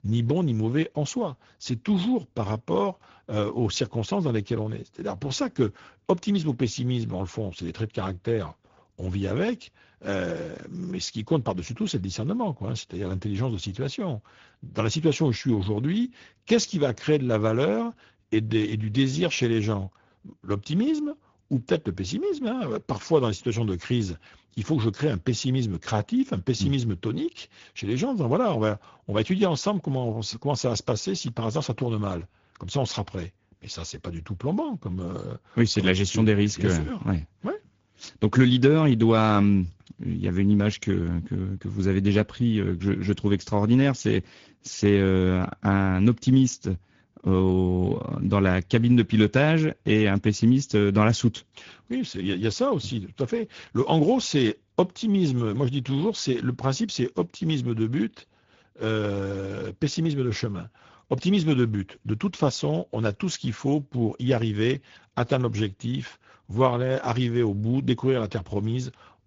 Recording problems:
high frequencies cut off; noticeable; nothing above 7 kHz
garbled, watery; slightly

